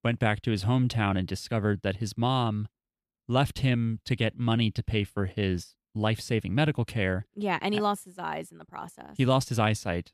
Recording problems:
none

